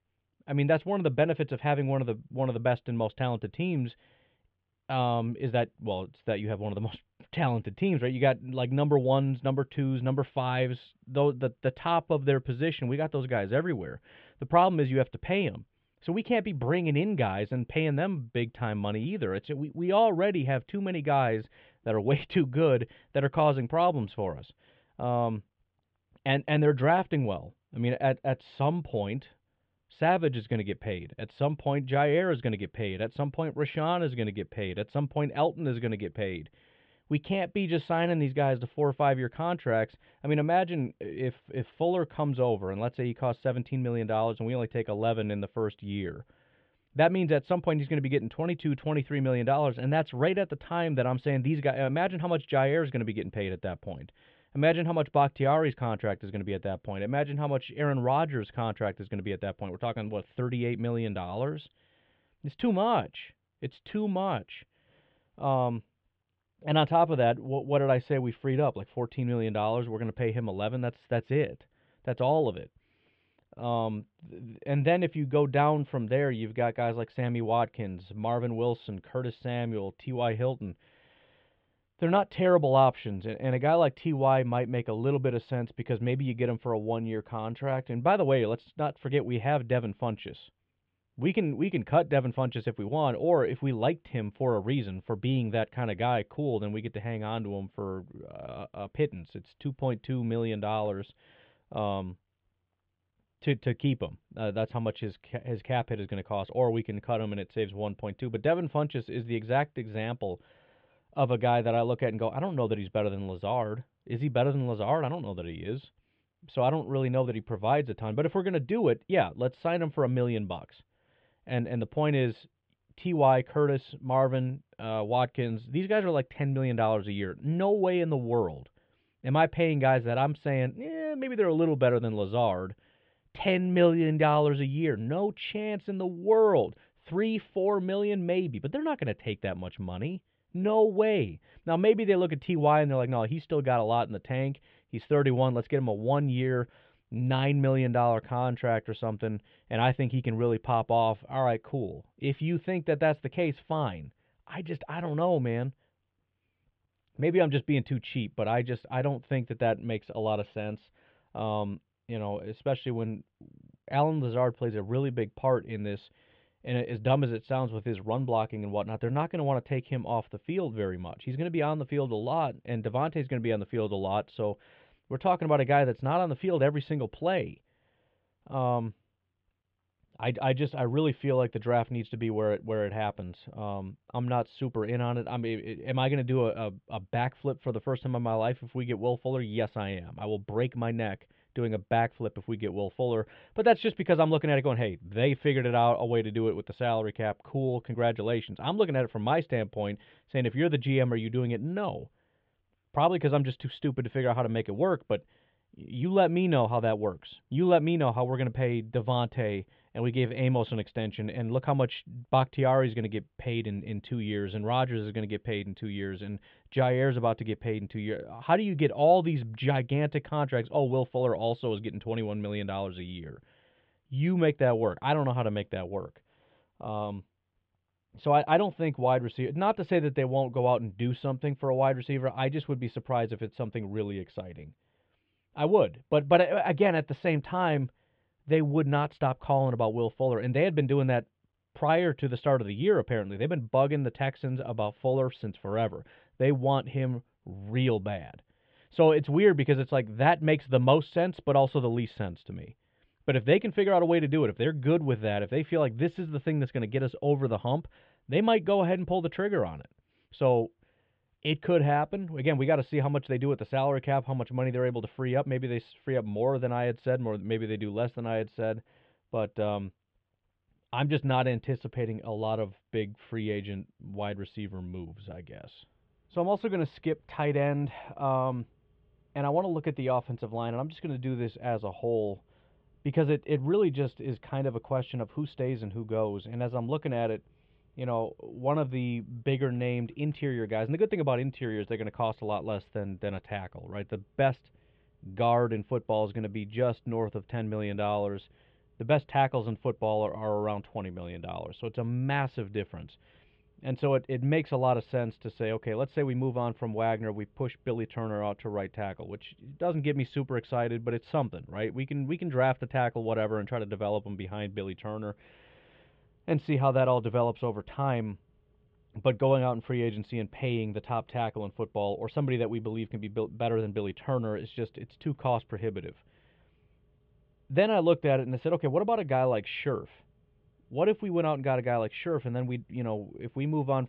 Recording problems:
muffled; very; fading above 3.5 kHz

